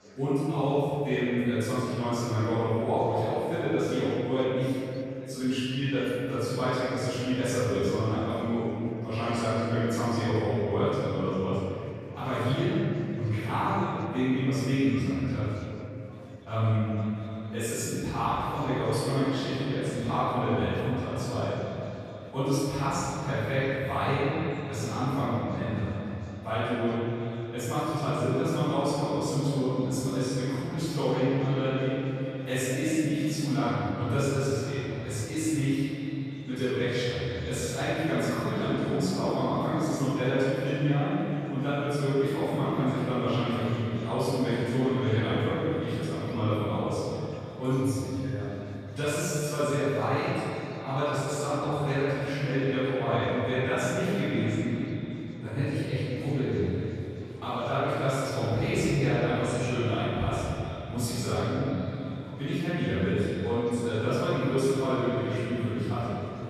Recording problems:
room echo; strong; dies away in 2.6 s
off-mic speech; far
echo of what is said; noticeable; from 17 s on; 320 ms later, 15 dB below the speech
murmuring crowd; faint; throughout; 25 dB below the speech

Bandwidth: 14 kHz